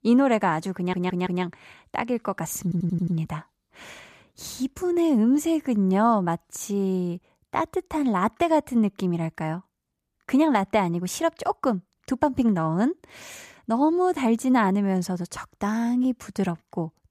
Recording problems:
audio stuttering; at 1 s and at 2.5 s

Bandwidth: 14.5 kHz